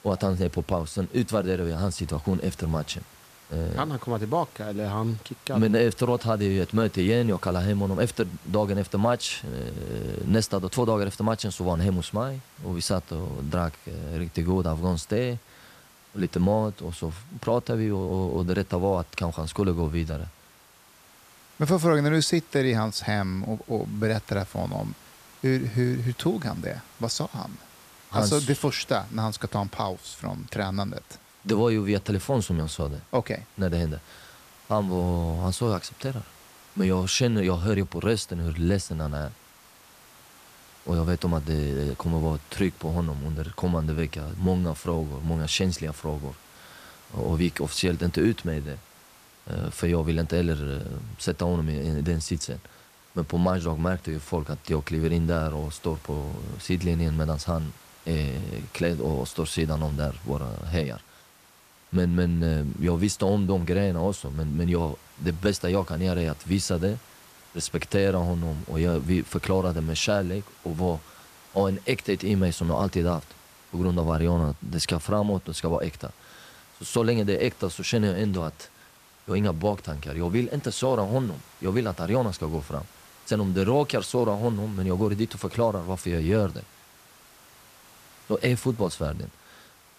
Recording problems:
hiss; faint; throughout; 25 dB below the speech

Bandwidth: 14.5 kHz